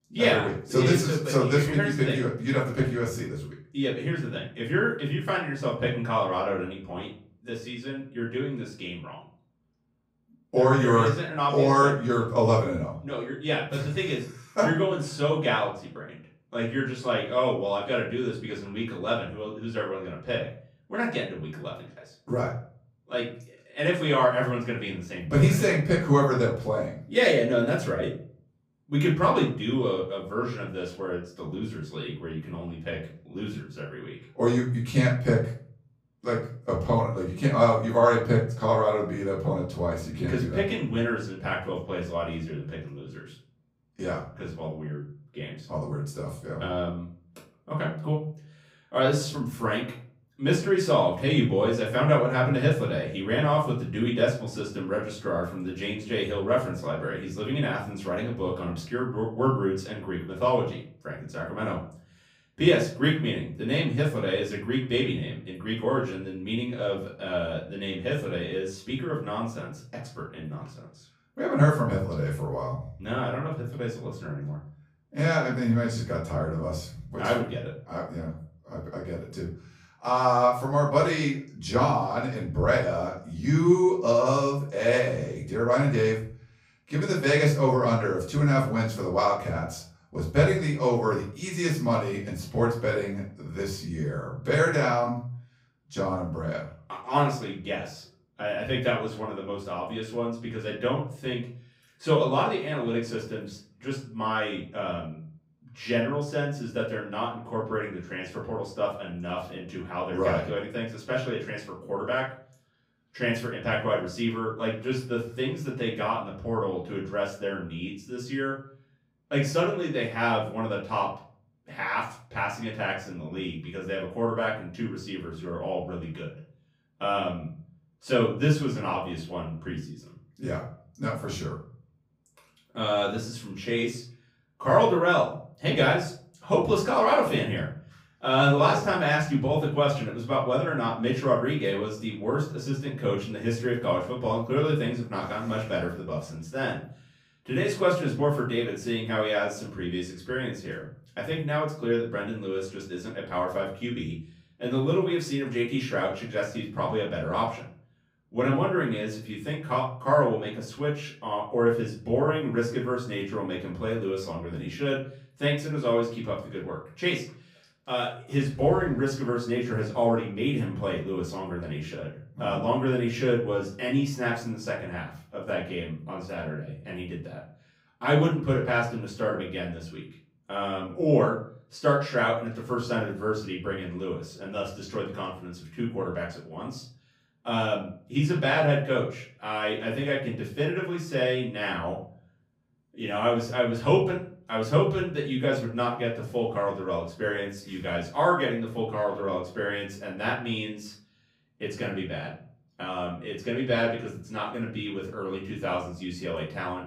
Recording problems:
off-mic speech; far
room echo; slight; dies away in 0.4 s

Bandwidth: 15.5 kHz